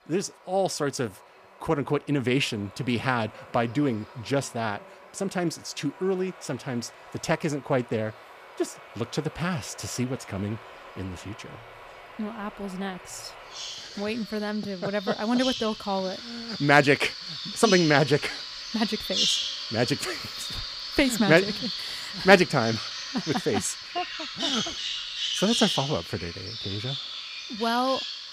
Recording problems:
animal sounds; loud; throughout; 4 dB below the speech

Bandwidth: 15 kHz